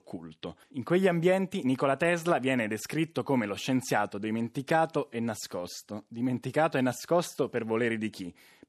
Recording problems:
none

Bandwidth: 13.5 kHz